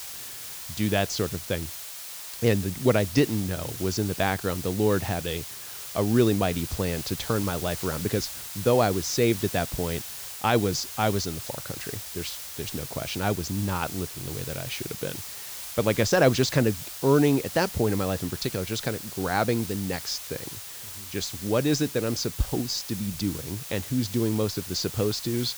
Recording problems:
high frequencies cut off; noticeable; nothing above 8 kHz
hiss; loud; throughout; 8 dB below the speech

